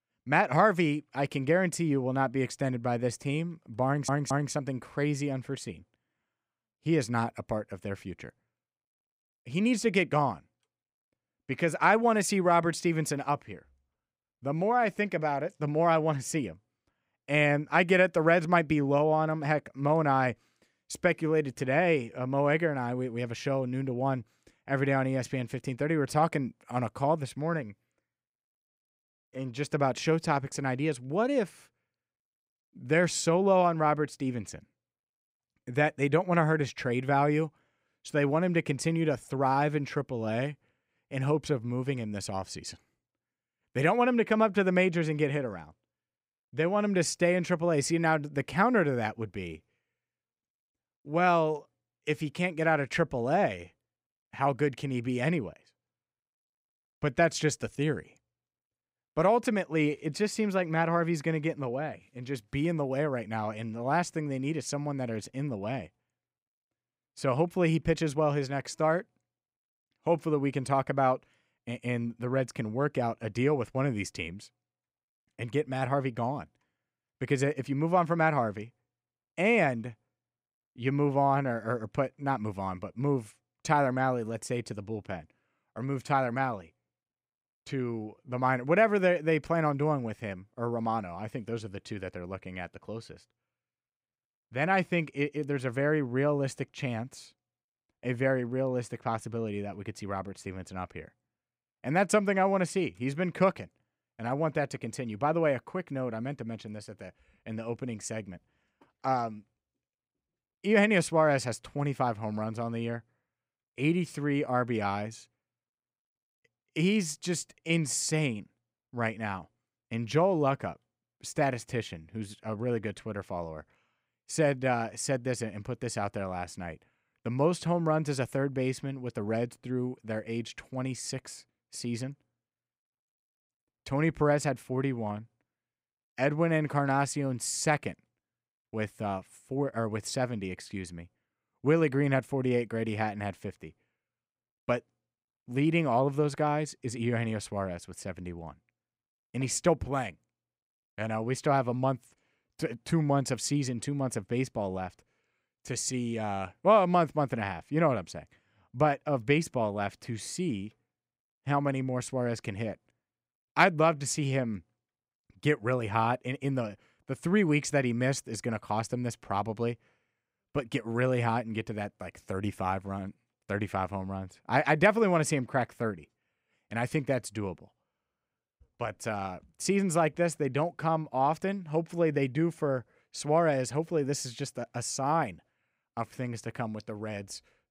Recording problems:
audio stuttering; at 4 s

